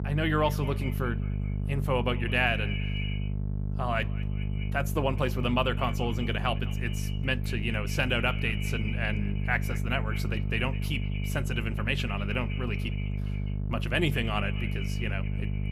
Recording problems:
echo of what is said; noticeable; throughout; 200 ms later, 15 dB below the speech
electrical hum; noticeable; throughout; 50 Hz, 15 dB below the speech

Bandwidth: 14.5 kHz